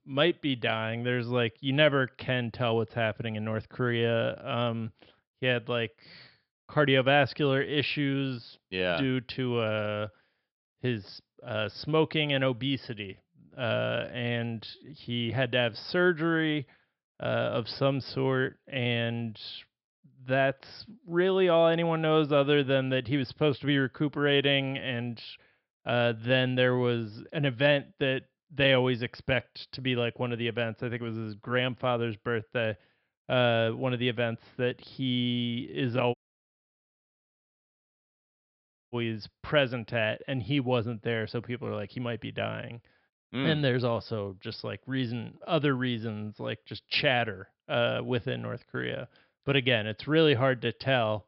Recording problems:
high frequencies cut off; noticeable; nothing above 5 kHz
audio cutting out; at 36 s for 3 s

